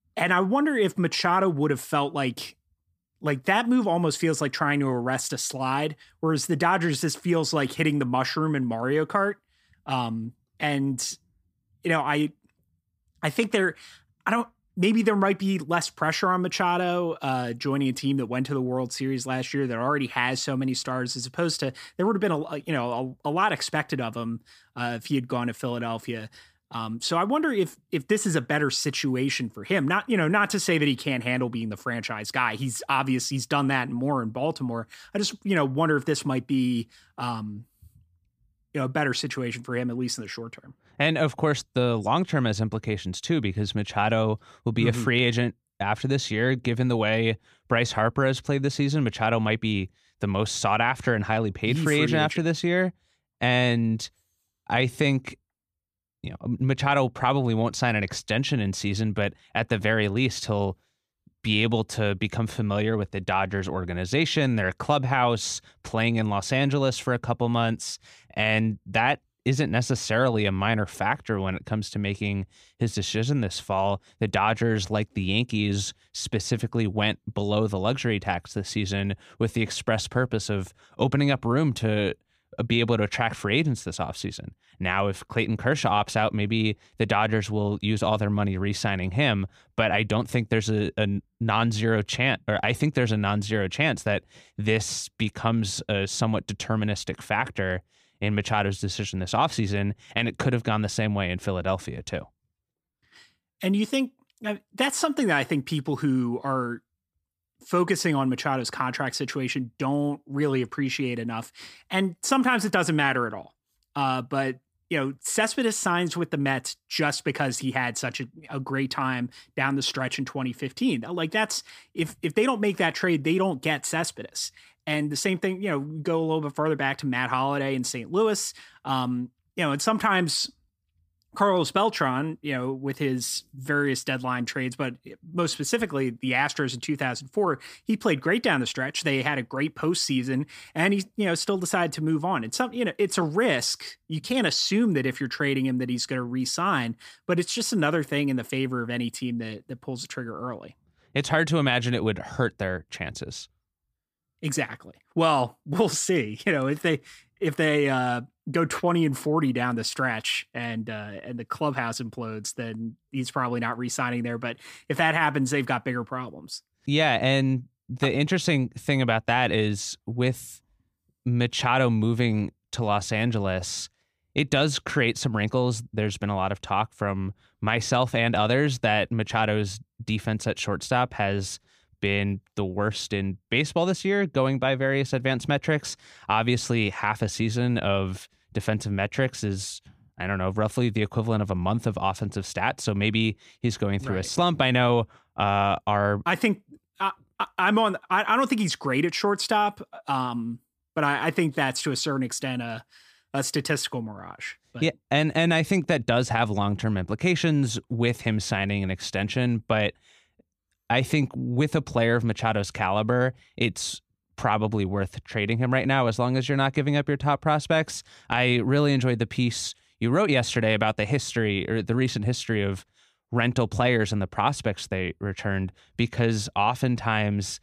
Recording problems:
none

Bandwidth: 15 kHz